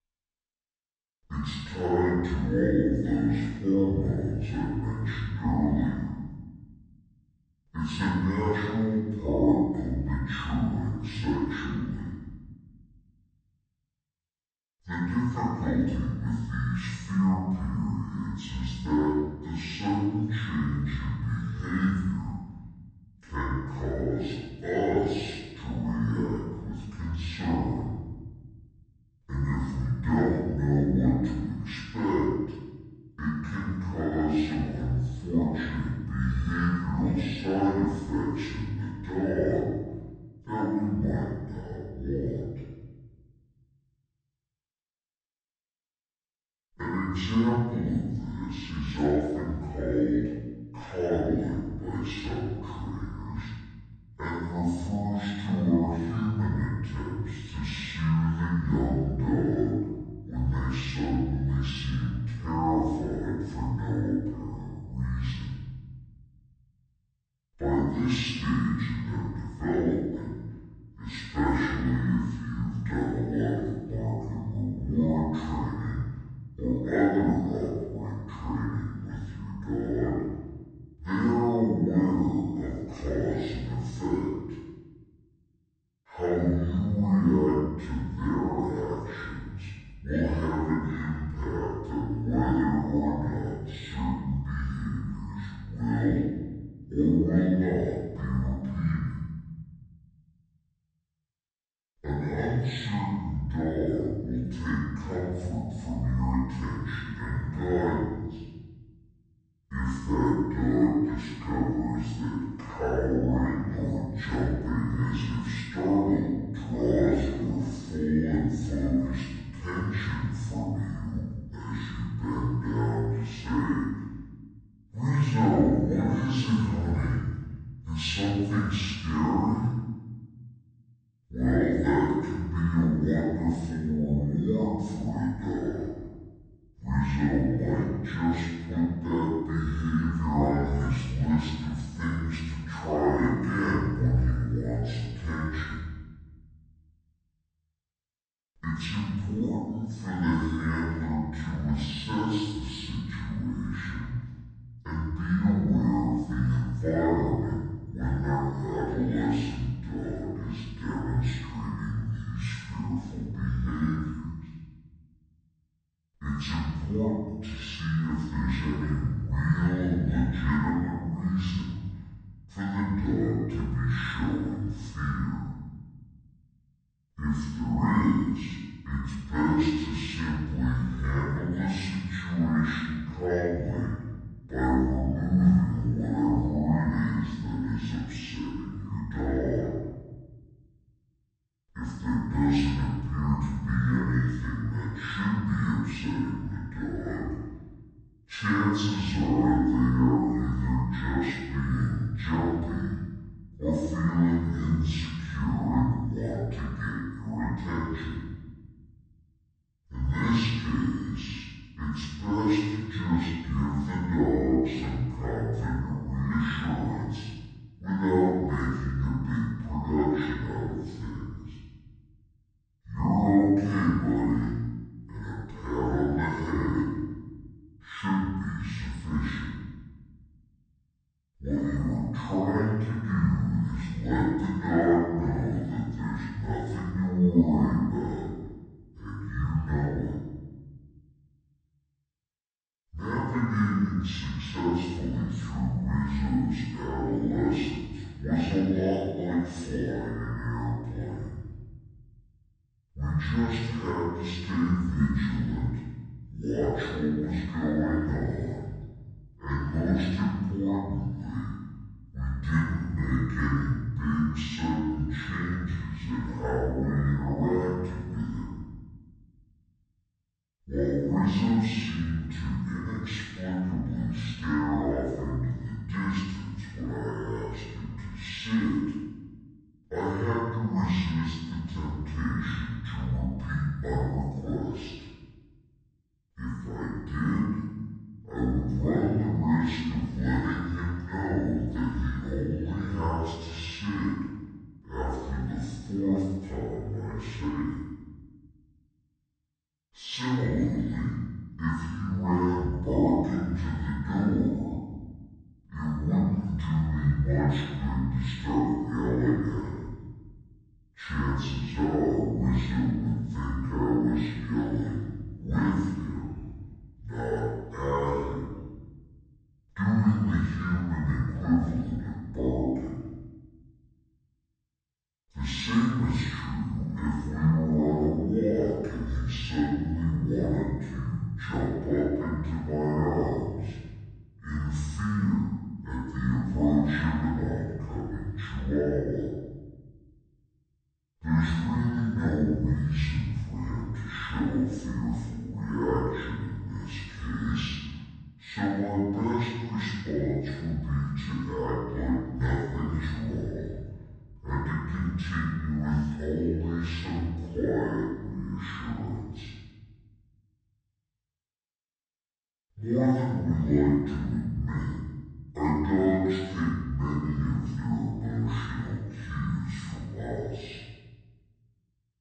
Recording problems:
room echo; strong; dies away in 1.1 s
off-mic speech; far
wrong speed and pitch; too slow and too low; 0.6 times normal speed

